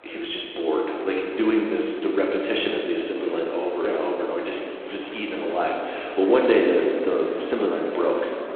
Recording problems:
phone-call audio; poor line
room echo; noticeable; dies away in 1.9 s
off-mic speech; somewhat distant
chatter from many people; noticeable; throughout; 15 dB below the speech

